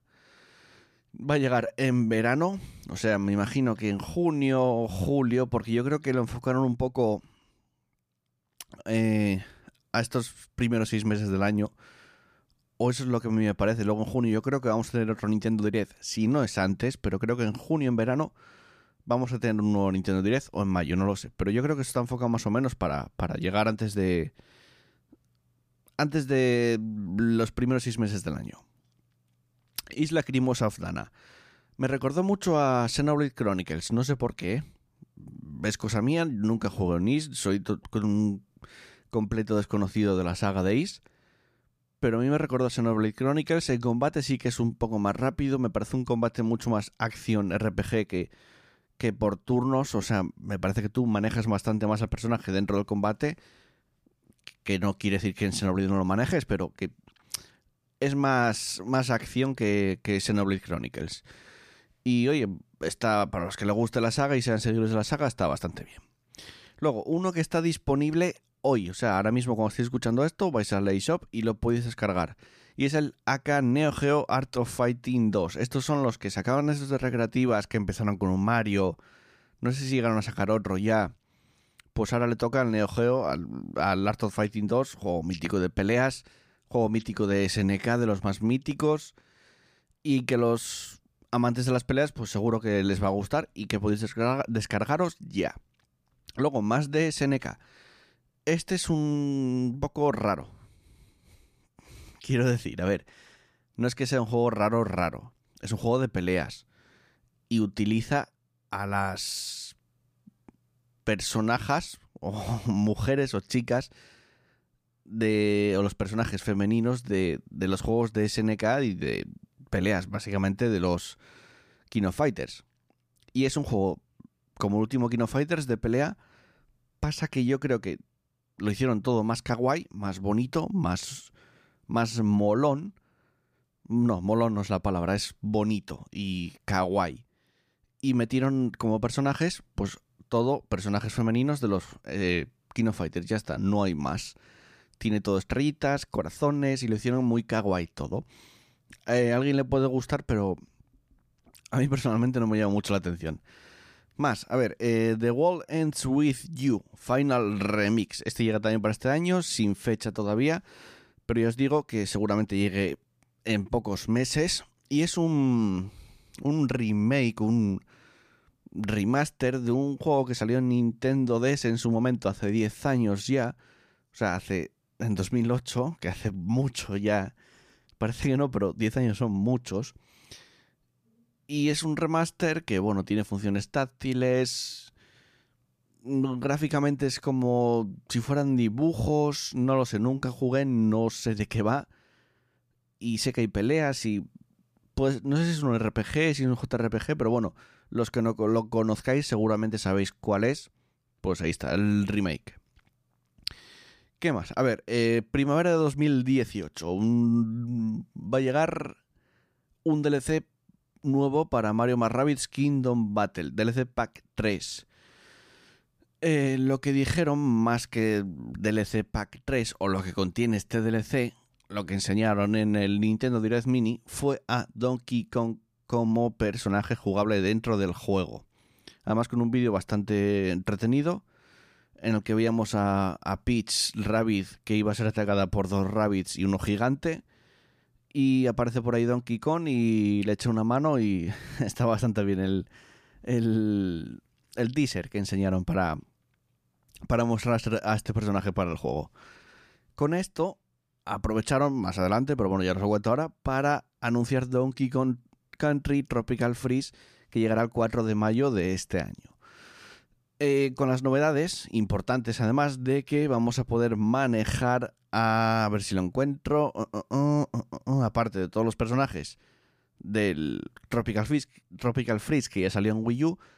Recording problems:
none

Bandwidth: 15 kHz